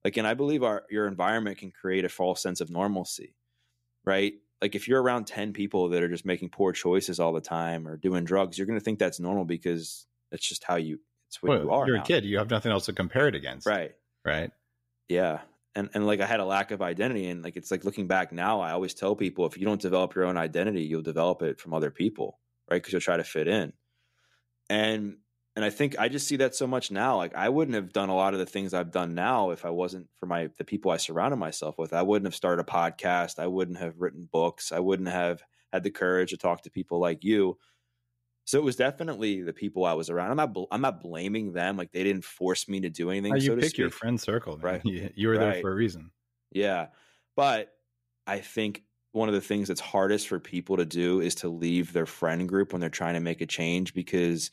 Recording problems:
none

